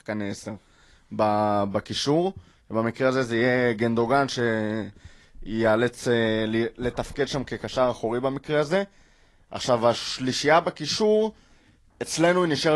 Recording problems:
garbled, watery; slightly; nothing above 11.5 kHz
abrupt cut into speech; at the end

